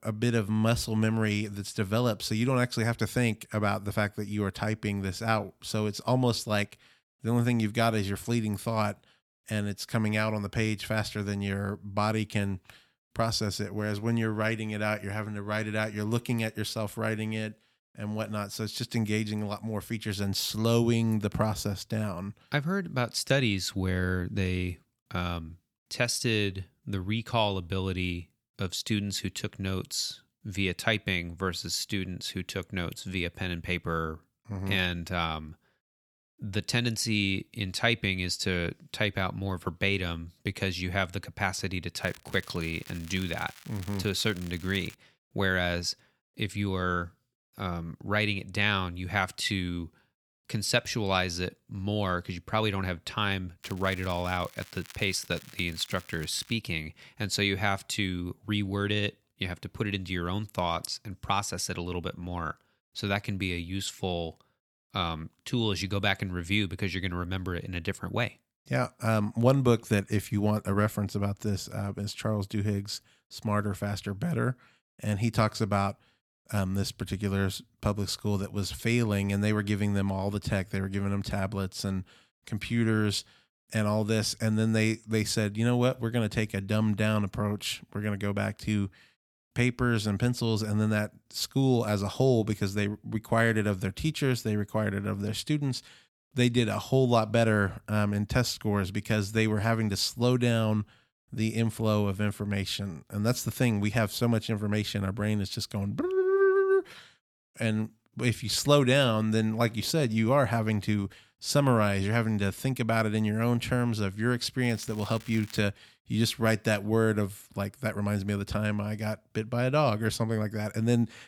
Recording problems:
crackling; noticeable; from 42 to 45 s, from 54 to 57 s and at 1:55; 20 dB below the speech

